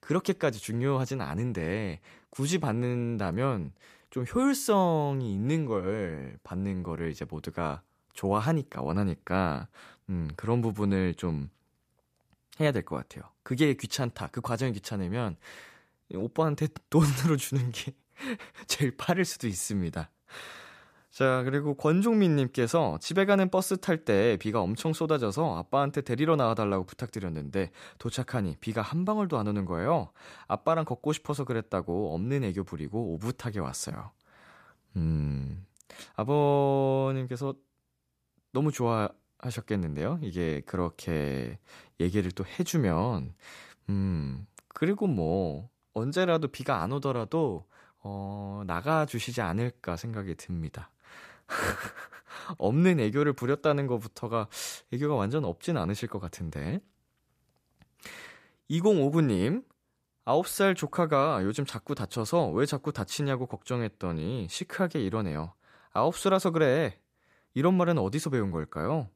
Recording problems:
none

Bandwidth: 14.5 kHz